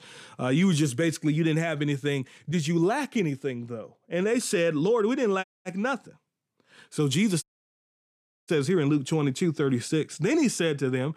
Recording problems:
audio cutting out; at 5.5 s and at 7.5 s for 1 s

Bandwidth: 14.5 kHz